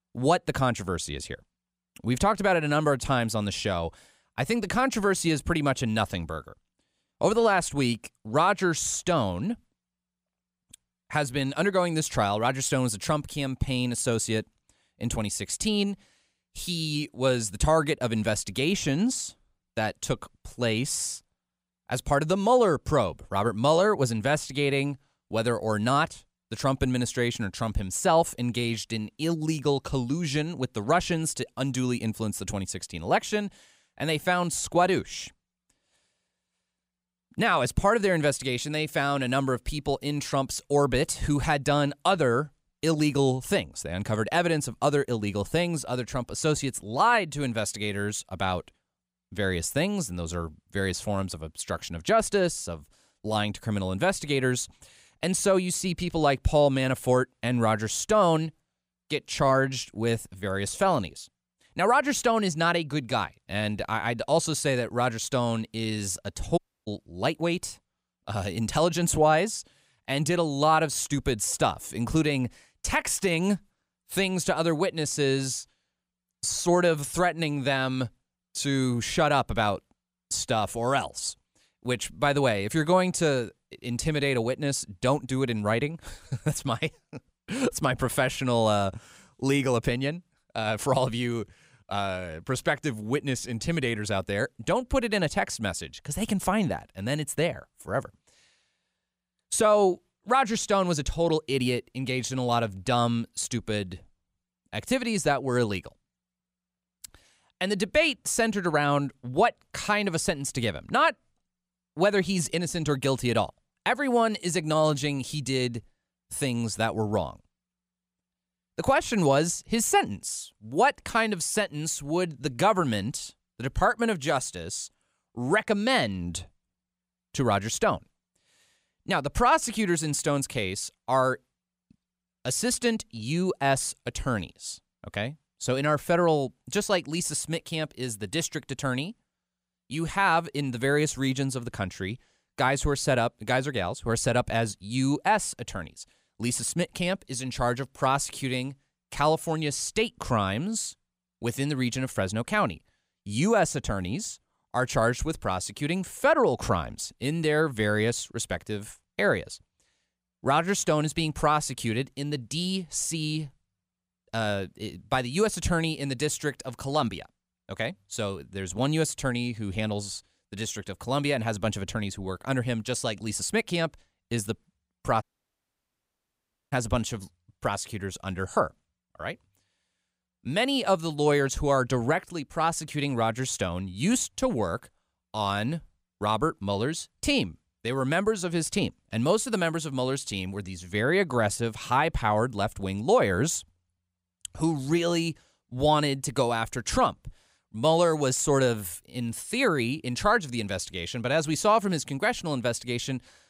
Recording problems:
audio cutting out; at 1:07 and at 2:55 for 1.5 s

